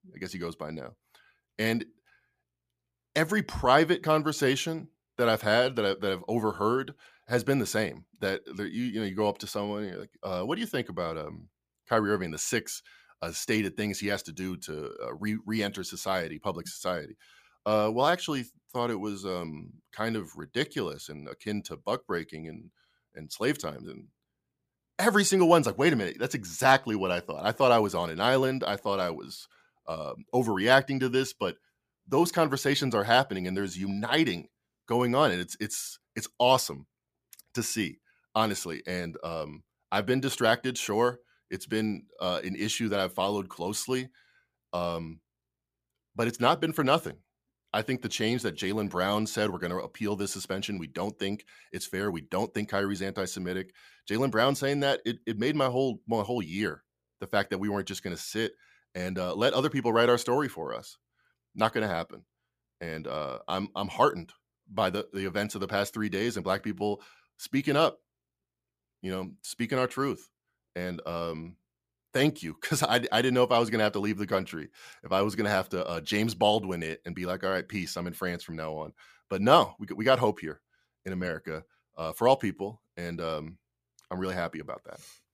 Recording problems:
none

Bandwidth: 15 kHz